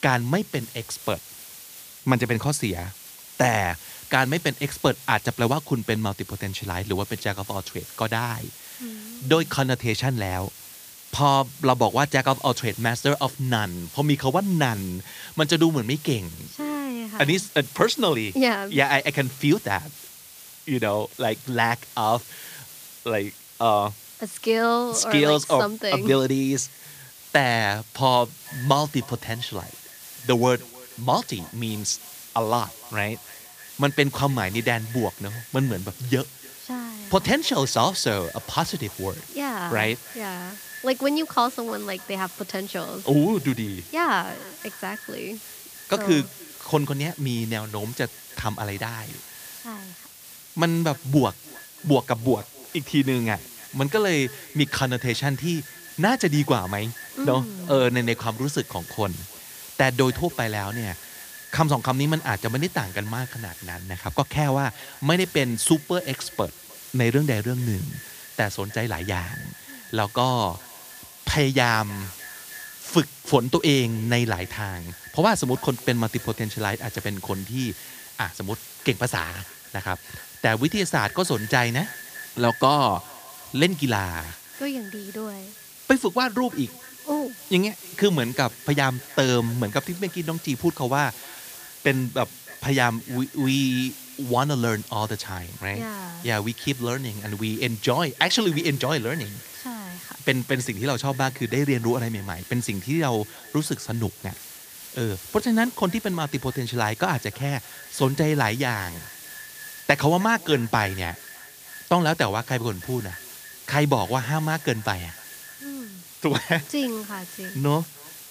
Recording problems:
echo of what is said; faint; from 28 s on; 310 ms later, 20 dB below the speech
hiss; noticeable; throughout; 15 dB below the speech

